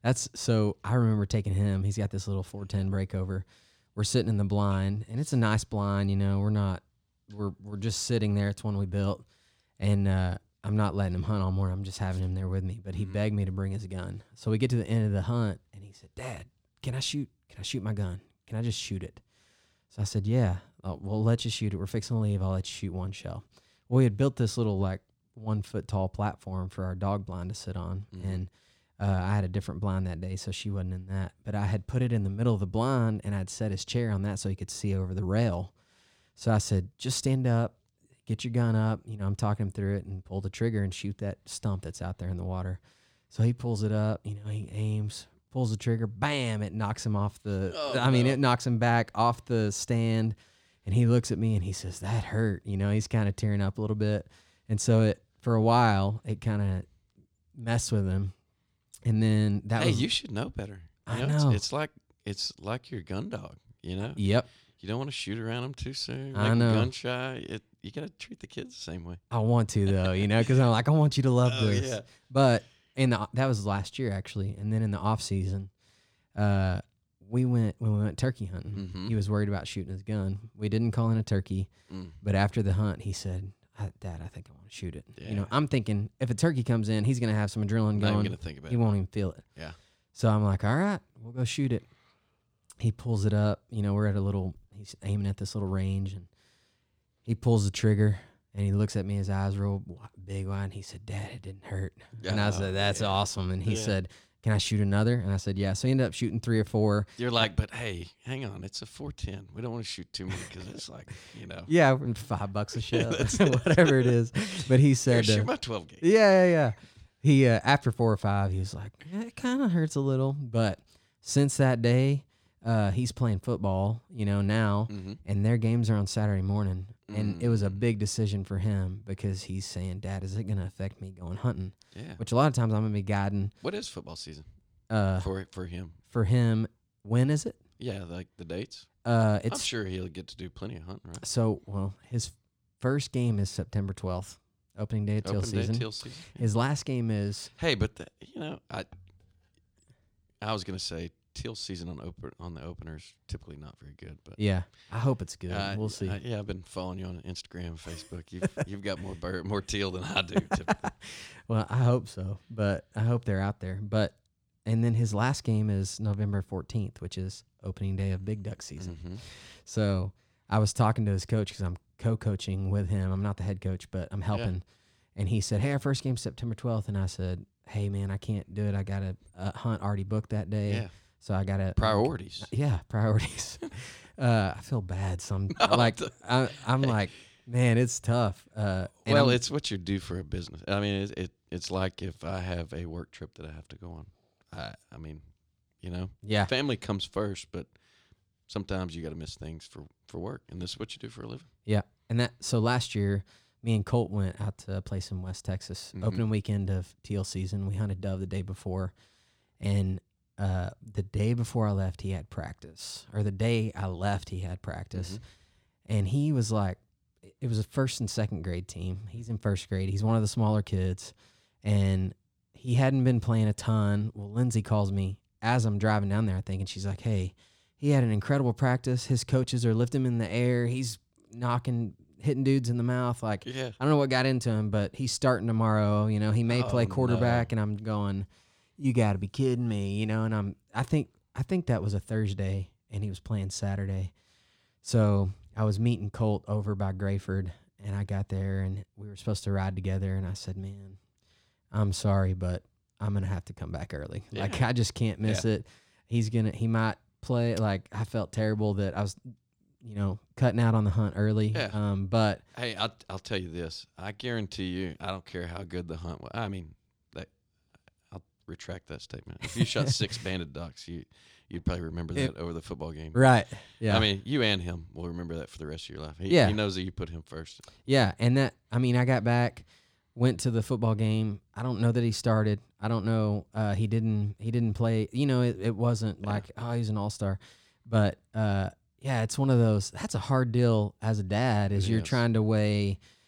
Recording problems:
none

